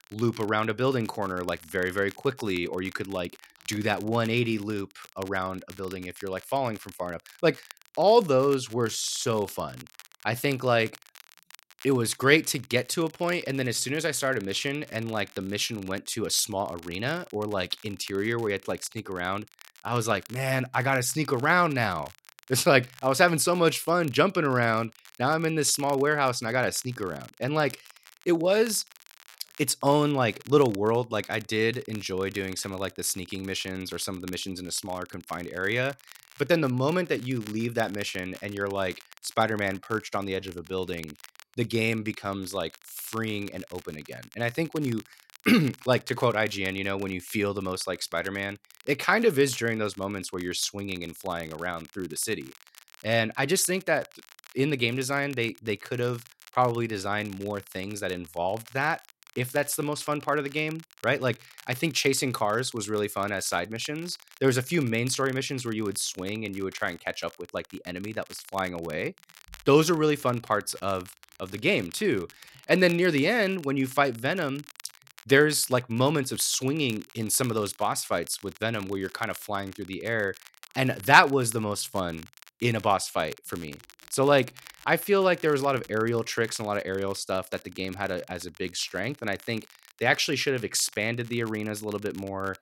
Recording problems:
crackle, like an old record; faint; 20 dB below the speech

